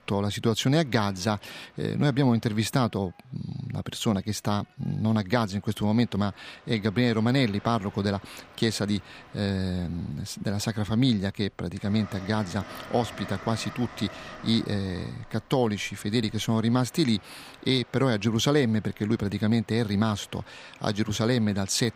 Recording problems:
train or aircraft noise; faint; throughout; 20 dB below the speech

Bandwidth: 15 kHz